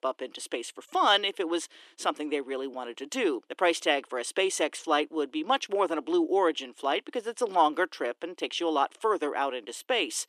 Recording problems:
thin; somewhat; fading below 300 Hz

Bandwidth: 13.5 kHz